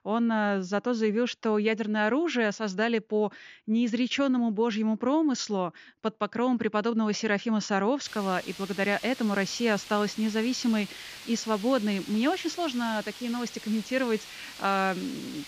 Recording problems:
high frequencies cut off; noticeable; nothing above 7 kHz
hiss; noticeable; from 8 s on; 15 dB below the speech

